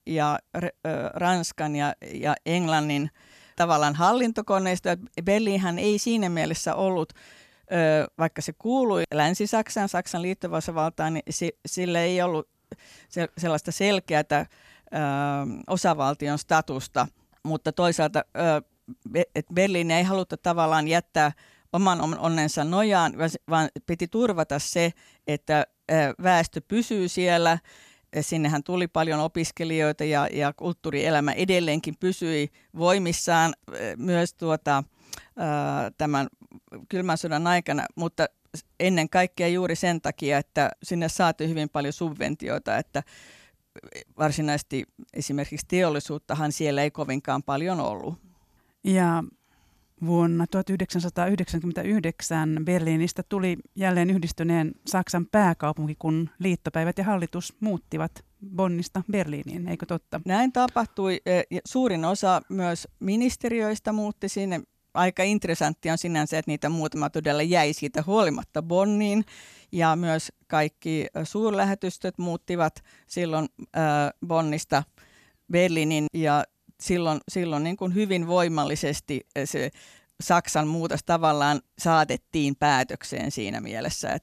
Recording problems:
none

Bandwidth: 14 kHz